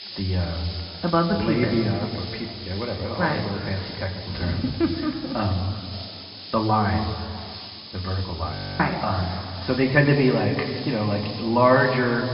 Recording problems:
off-mic speech; far
room echo; noticeable; dies away in 2.1 s
high frequencies cut off; noticeable; nothing above 5.5 kHz
hiss; noticeable; throughout; 10 dB below the speech
murmuring crowd; faint; throughout; 25 dB below the speech
audio freezing; at 8.5 s

